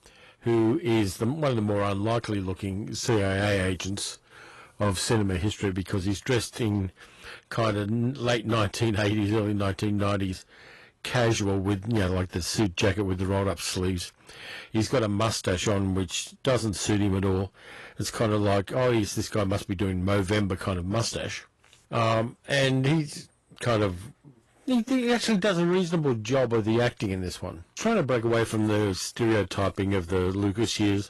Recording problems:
distortion; slight; 6% of the sound clipped
garbled, watery; slightly; nothing above 11.5 kHz

